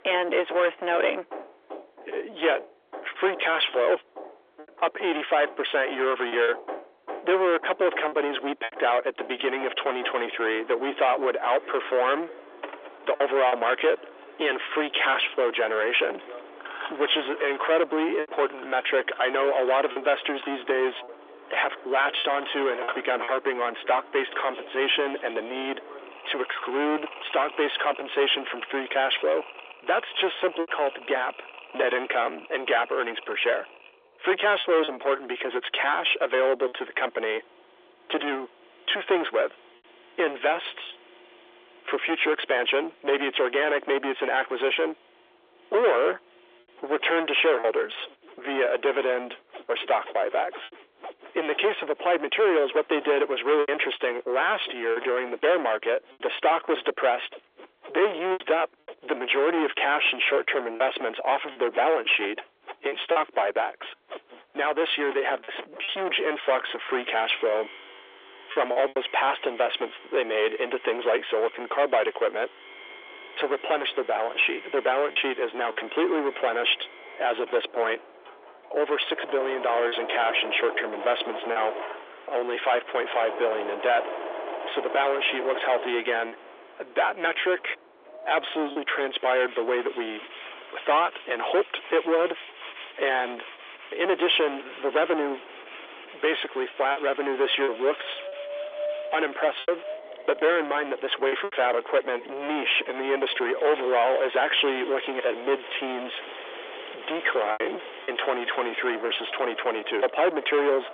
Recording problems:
distortion; heavy; 6 dB below the speech
phone-call audio; nothing above 3.5 kHz
machinery noise; noticeable; throughout; 15 dB below the speech
wind in the background; noticeable; from 1:13 on; 20 dB below the speech
choppy; occasionally; 2% of the speech affected

